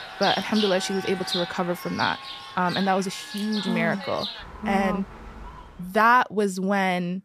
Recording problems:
animal sounds; loud; until 6 s; 8 dB below the speech

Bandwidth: 14.5 kHz